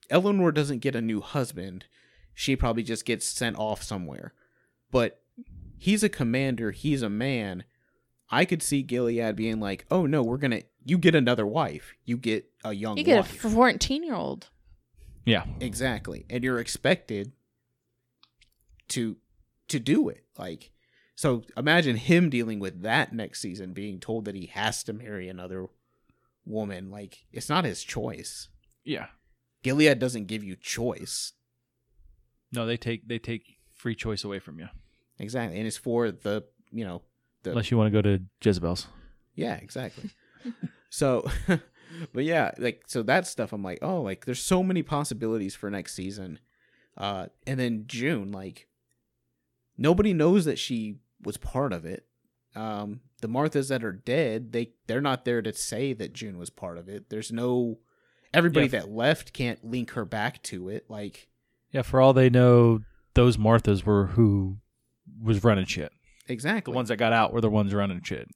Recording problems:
none

